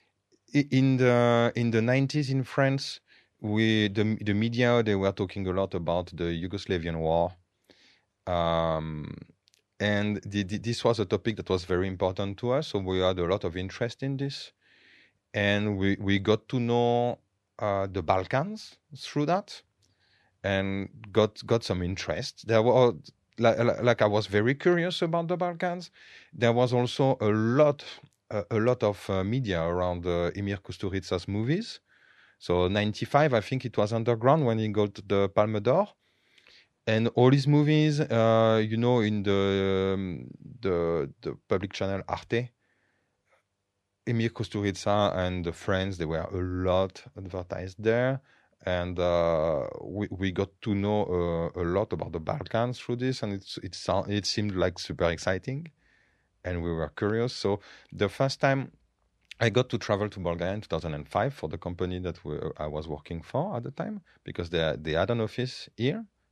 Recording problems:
none

